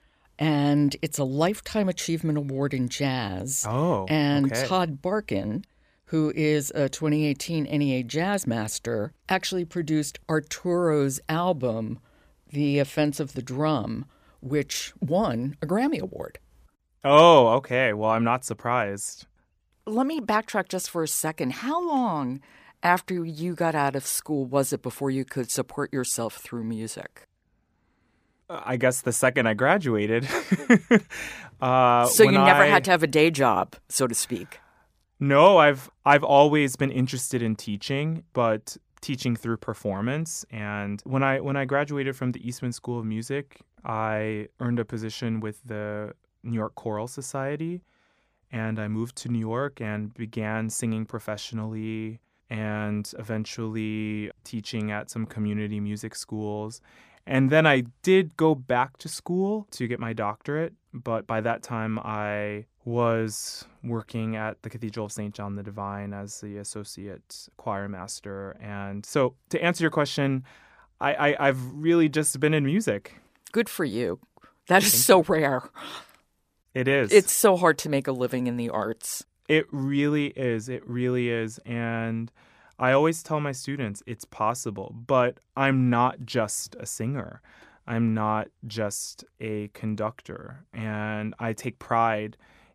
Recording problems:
none

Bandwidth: 15 kHz